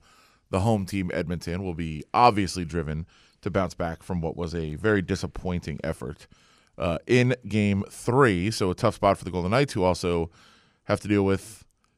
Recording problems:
none

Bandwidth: 15 kHz